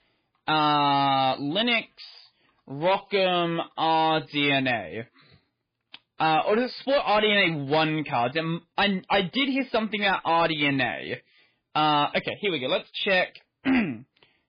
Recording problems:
garbled, watery; badly
distortion; slight; 7% of the sound clipped

